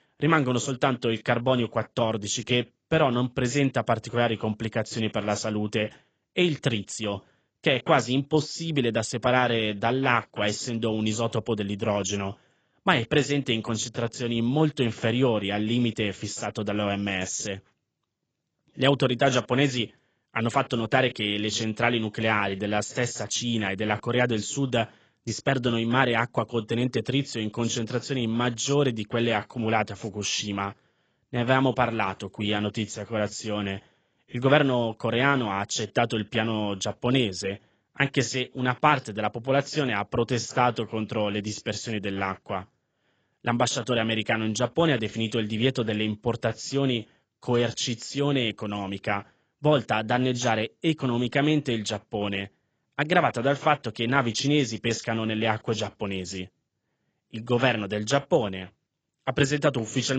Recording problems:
garbled, watery; badly; nothing above 7.5 kHz
abrupt cut into speech; at the end

